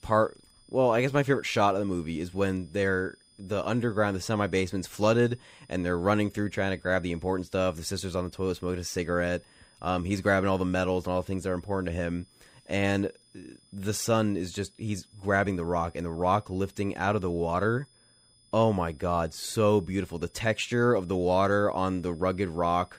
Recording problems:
high-pitched whine; faint; throughout; 5 kHz, 30 dB below the speech

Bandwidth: 15.5 kHz